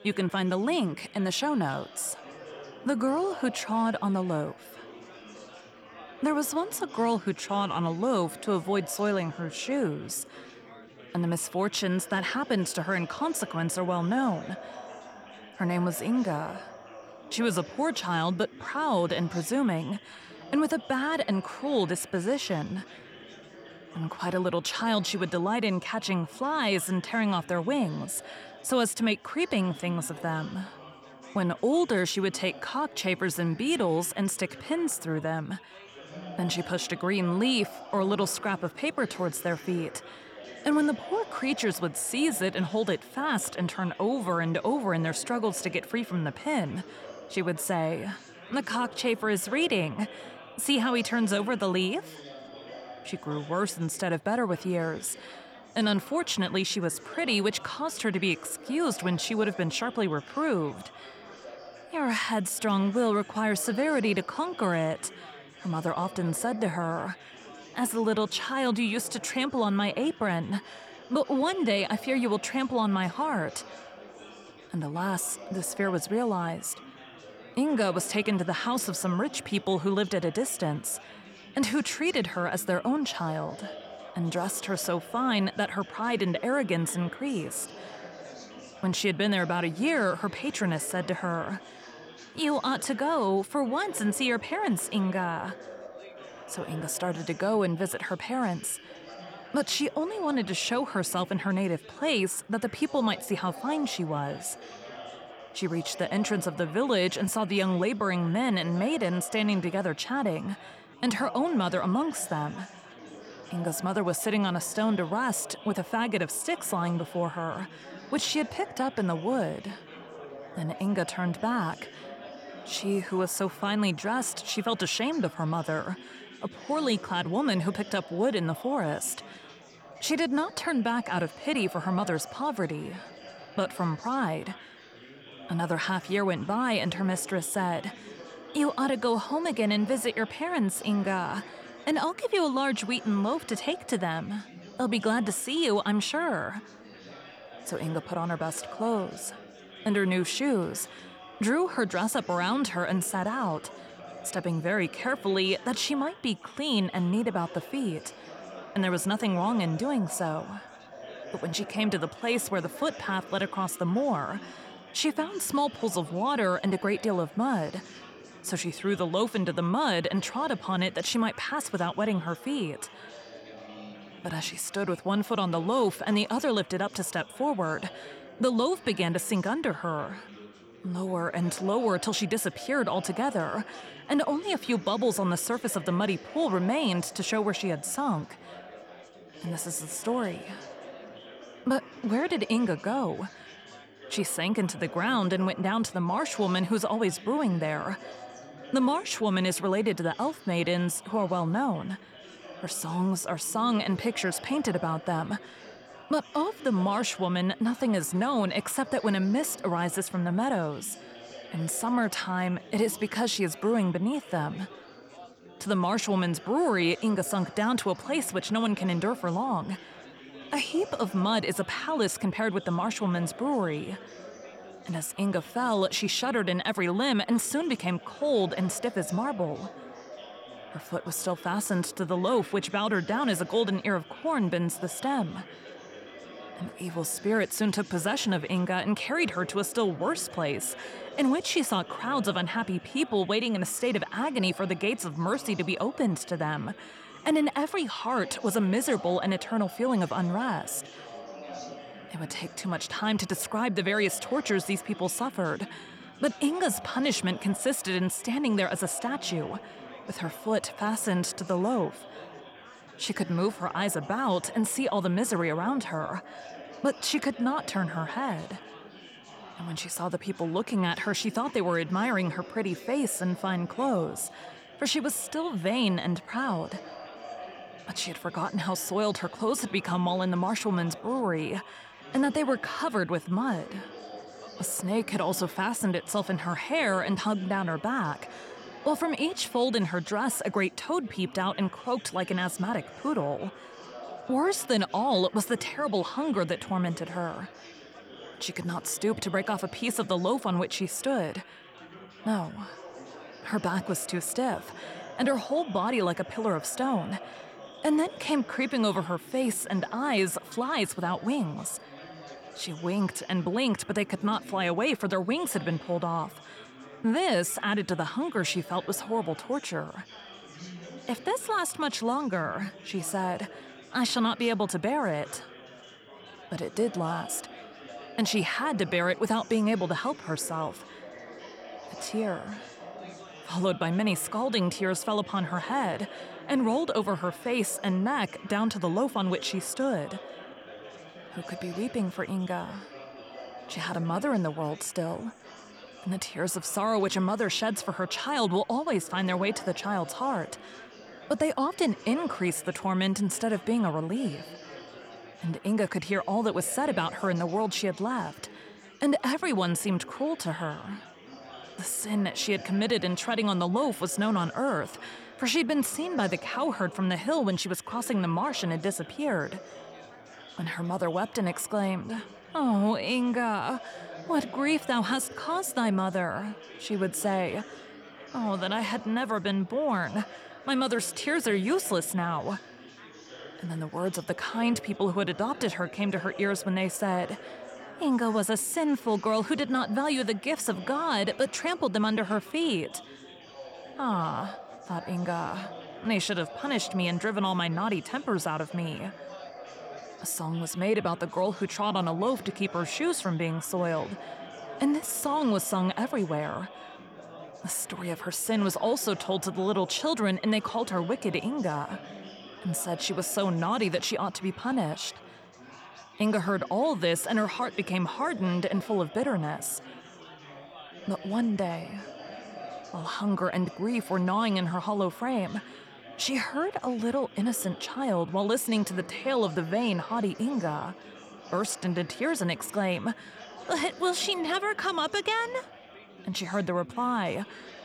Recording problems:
chatter from many people; noticeable; throughout; 15 dB below the speech

